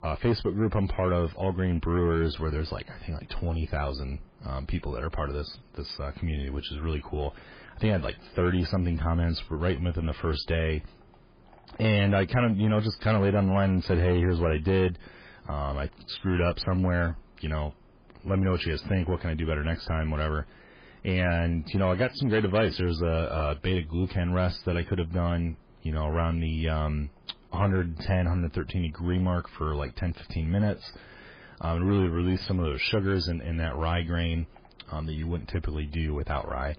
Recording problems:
garbled, watery; badly; nothing above 5 kHz
distortion; slight; 10 dB below the speech

